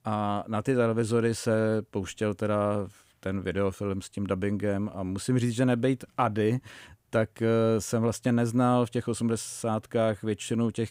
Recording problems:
none

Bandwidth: 15.5 kHz